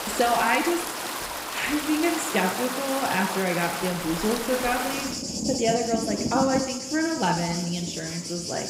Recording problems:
room echo; noticeable; dies away in 1 s
off-mic speech; somewhat distant
rain or running water; loud; throughout; 4 dB below the speech

